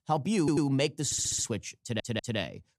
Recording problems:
audio stuttering; at 0.5 s, at 1 s and at 2 s

